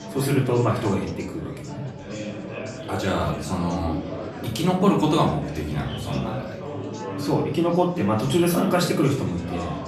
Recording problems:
off-mic speech; far
room echo; slight; dies away in 0.5 s
chatter from many people; loud; throughout; 10 dB below the speech
background music; faint; throughout; 25 dB below the speech

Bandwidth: 13.5 kHz